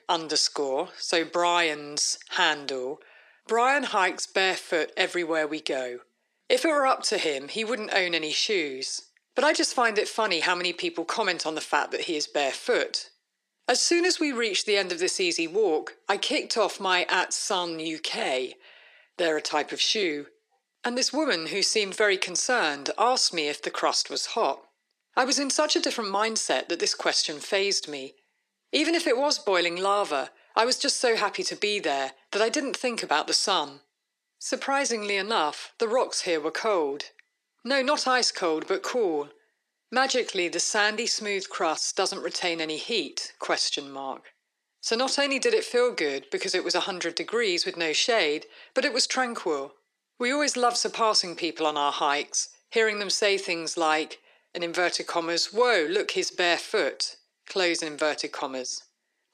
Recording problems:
thin; somewhat; fading below 350 Hz

